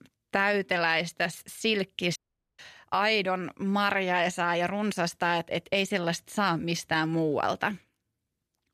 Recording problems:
audio cutting out; at 2 s

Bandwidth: 14 kHz